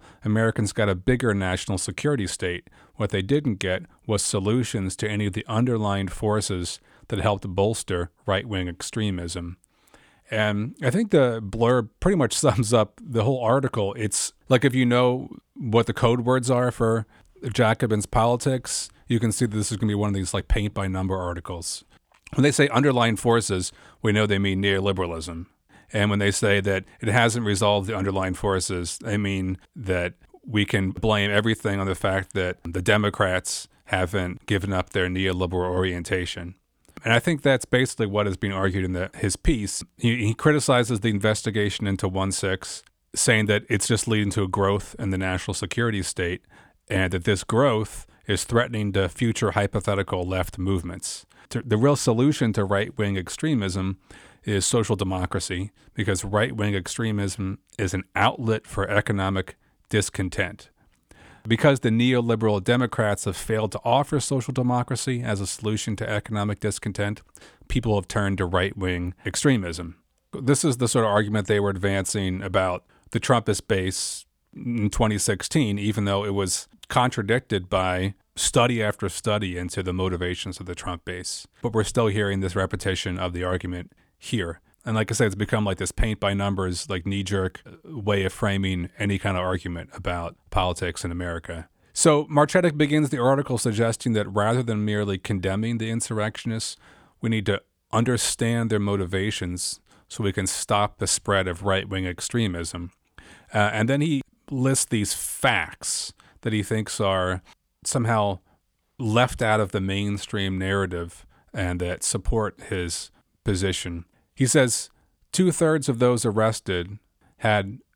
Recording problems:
none

